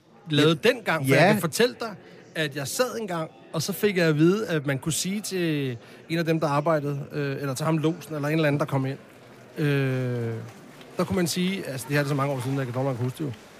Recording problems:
chatter from many people; faint; throughout; 20 dB below the speech

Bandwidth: 15 kHz